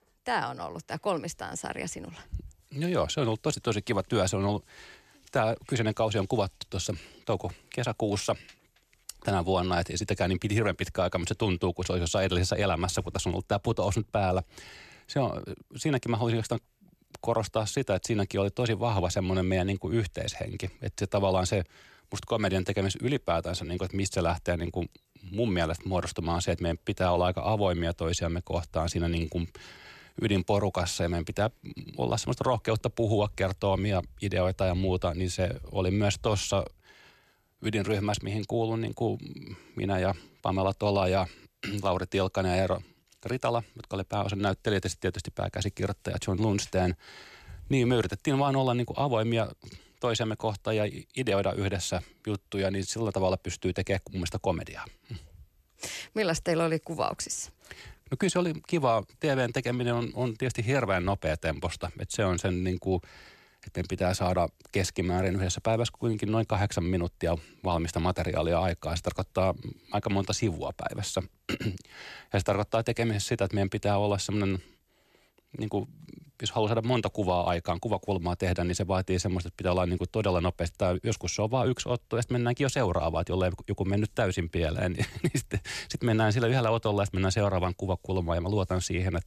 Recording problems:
none

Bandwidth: 14 kHz